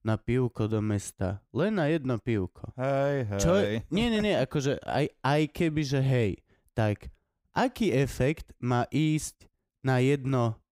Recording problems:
none

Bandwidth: 15.5 kHz